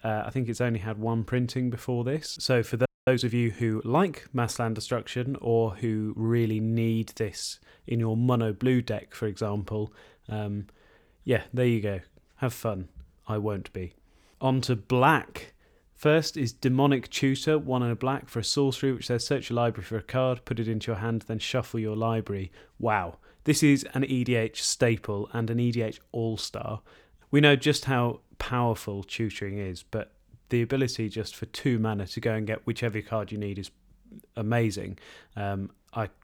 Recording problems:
audio freezing; at 3 s

